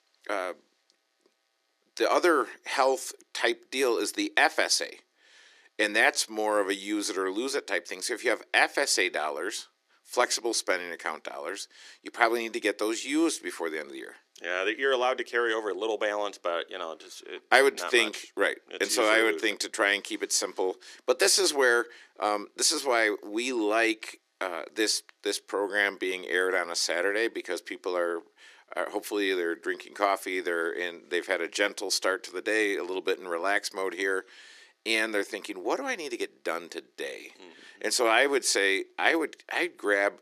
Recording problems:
thin; very; fading below 300 Hz

